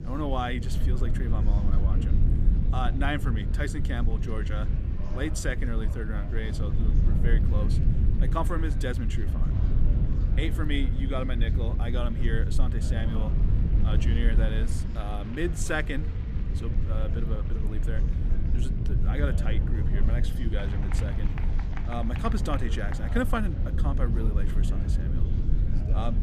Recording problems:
low rumble; loud; throughout; 7 dB below the speech
murmuring crowd; noticeable; throughout; 15 dB below the speech

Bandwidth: 15 kHz